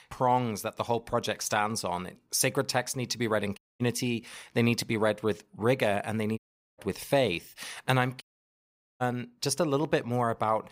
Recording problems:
audio cutting out; at 3.5 s, at 6.5 s and at 8 s for 1 s

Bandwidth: 15.5 kHz